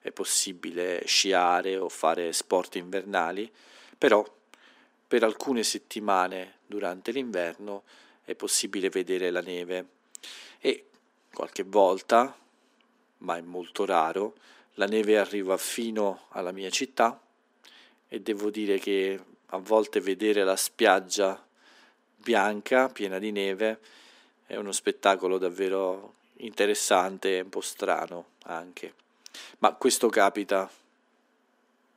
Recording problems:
thin; somewhat; fading below 300 Hz

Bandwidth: 15.5 kHz